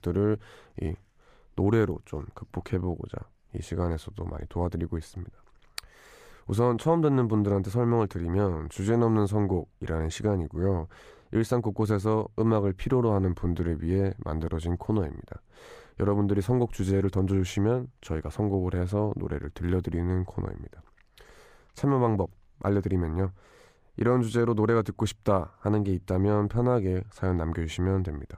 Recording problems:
none

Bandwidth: 15 kHz